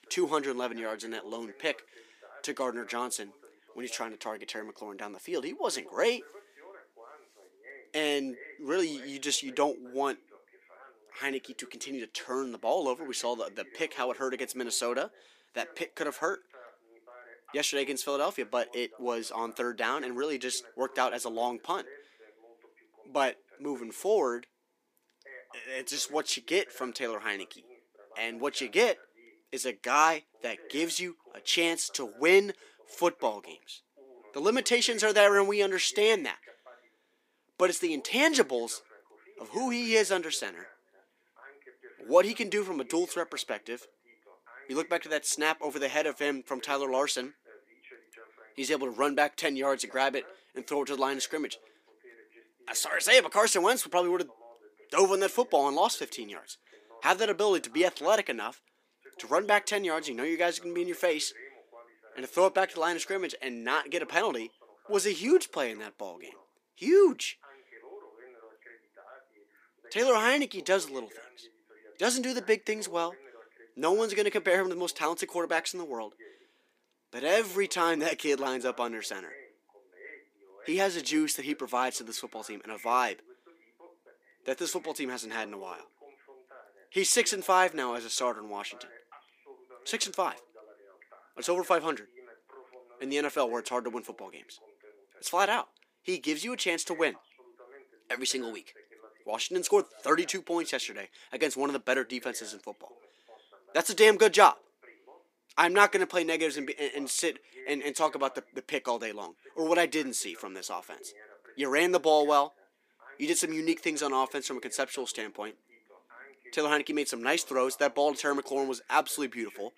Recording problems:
thin; very slightly; fading below 300 Hz
voice in the background; faint; throughout; 25 dB below the speech

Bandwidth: 15 kHz